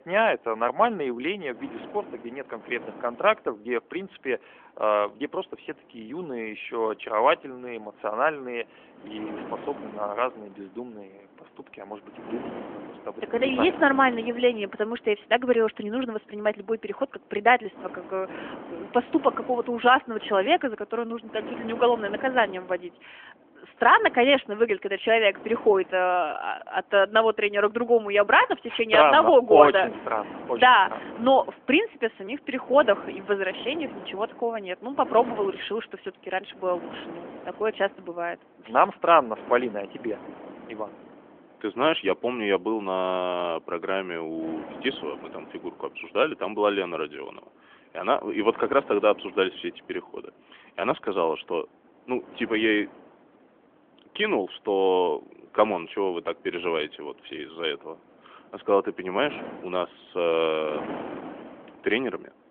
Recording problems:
phone-call audio; nothing above 3.5 kHz
wind noise on the microphone; occasional gusts; 20 dB below the speech

